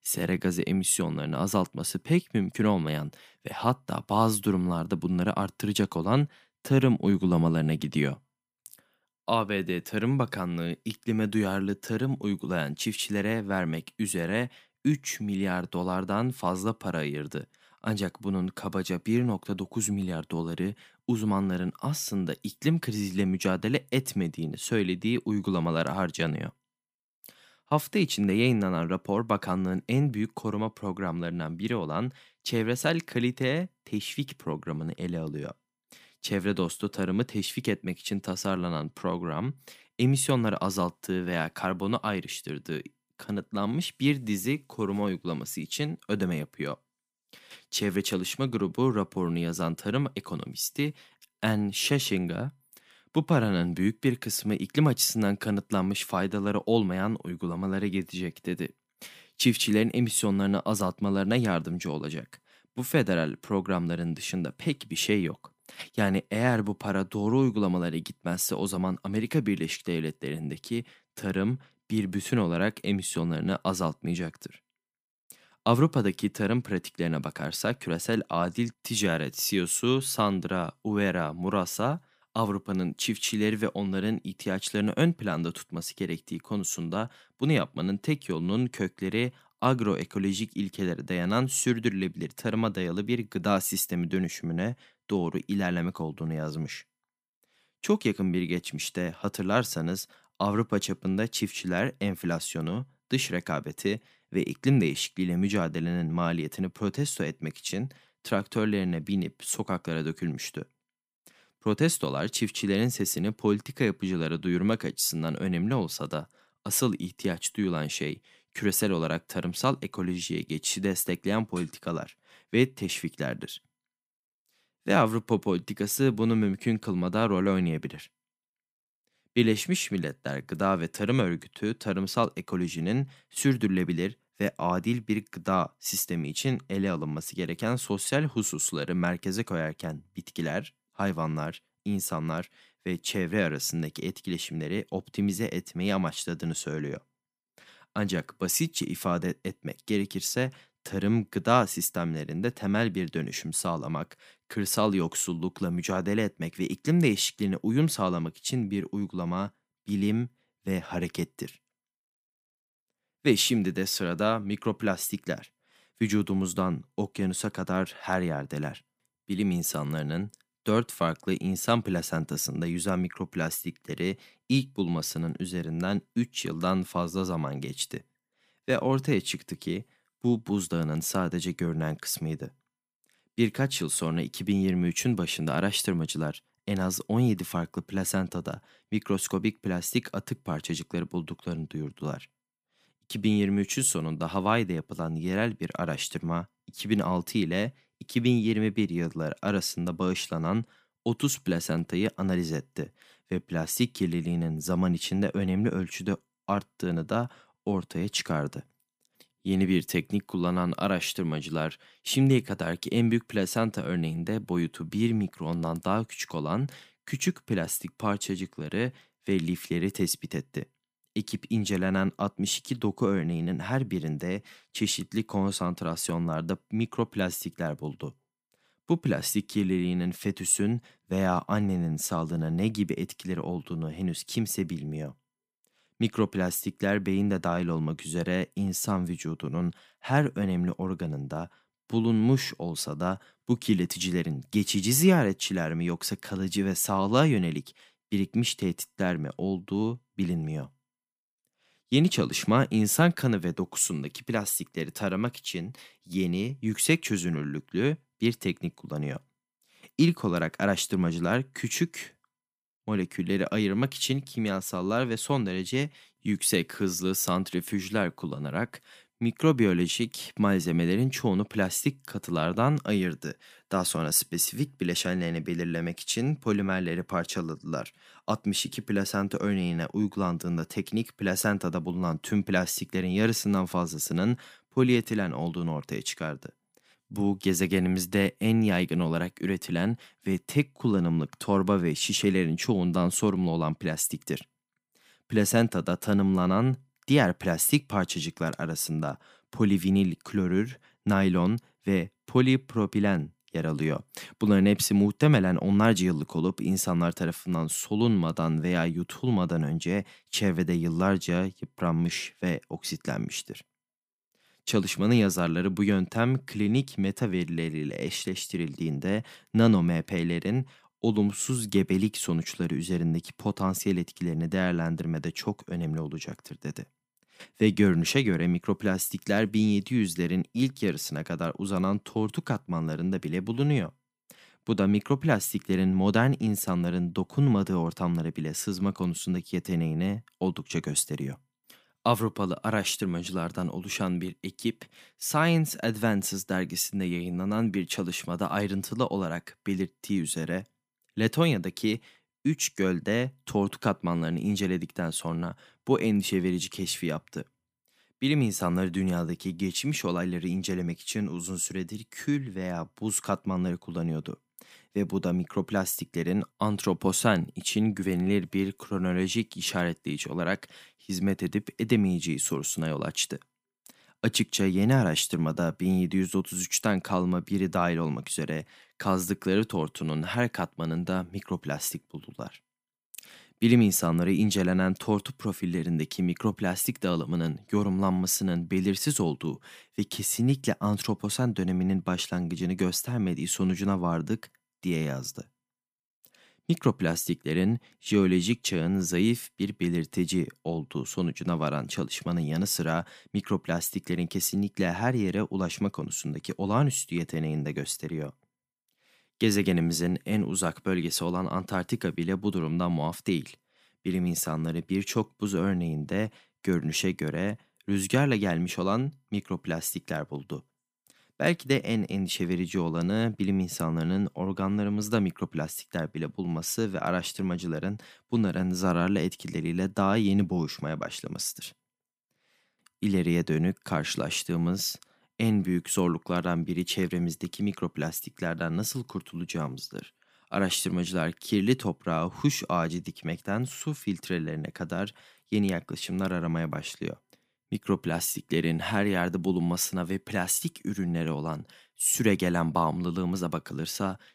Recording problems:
none

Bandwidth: 15 kHz